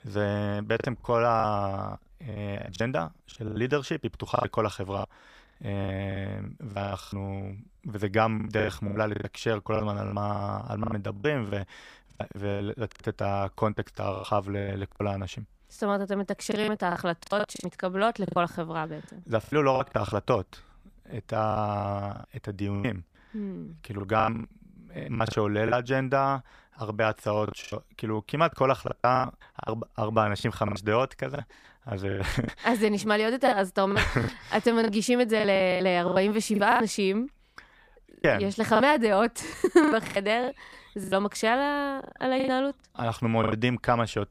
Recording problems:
choppy; very; 14% of the speech affected

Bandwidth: 15 kHz